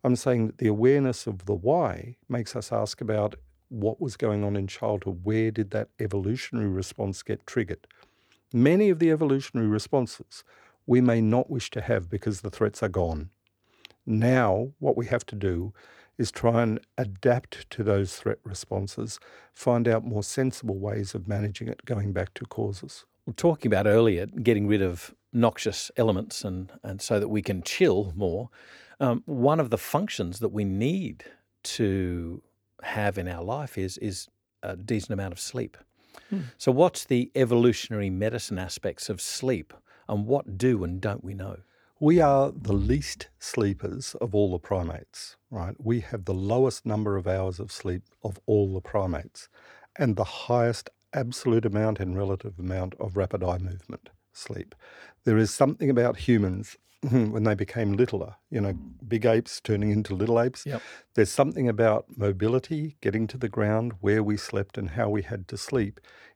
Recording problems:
none

